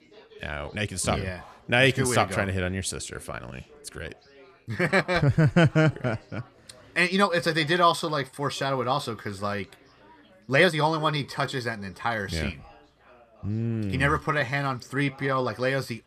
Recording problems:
background chatter; faint; throughout; 3 voices, 25 dB below the speech
uneven, jittery; strongly; from 0.5 to 15 s

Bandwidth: 14.5 kHz